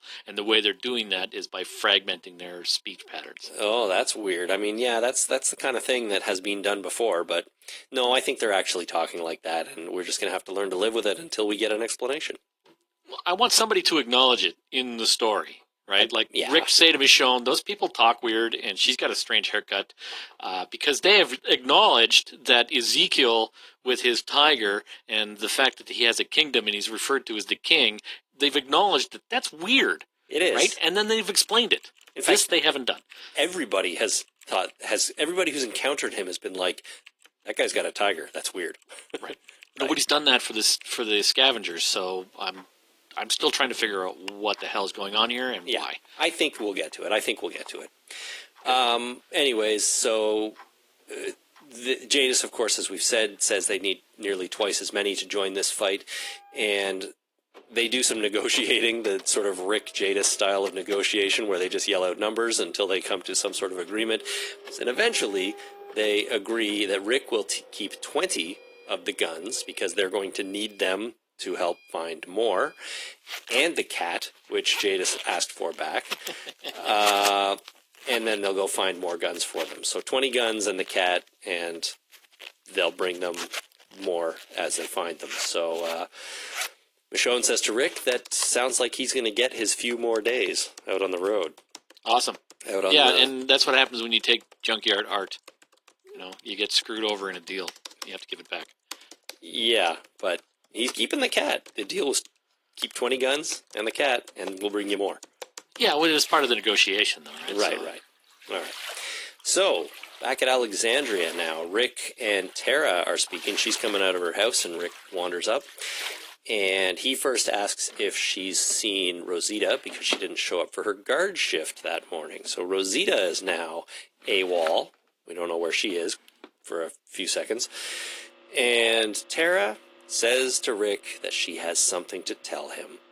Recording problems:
thin; somewhat; fading below 300 Hz
garbled, watery; slightly
household noises; noticeable; from 30 s on; 15 dB below the speech

